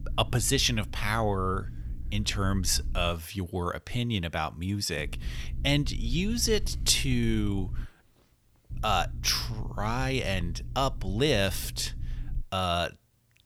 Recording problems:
low rumble; faint; until 3 s, from 5 to 8 s and from 8.5 to 12 s; 25 dB below the speech

